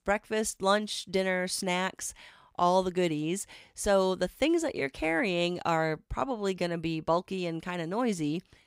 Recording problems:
none

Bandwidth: 15.5 kHz